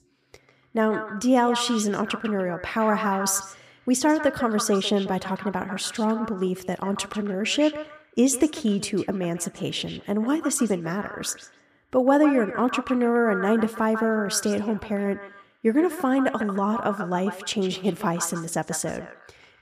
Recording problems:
echo of what is said; strong; throughout; 150 ms later, 10 dB below the speech

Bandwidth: 14.5 kHz